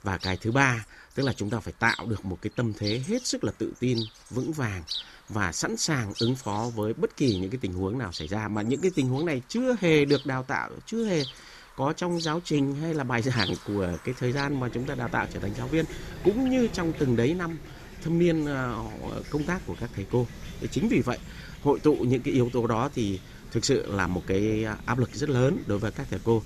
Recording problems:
animal sounds; noticeable; throughout; 15 dB below the speech

